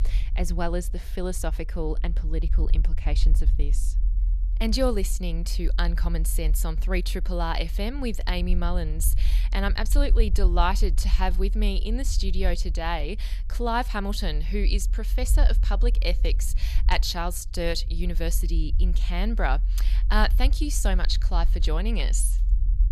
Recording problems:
low rumble; noticeable; throughout; 20 dB below the speech

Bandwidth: 13.5 kHz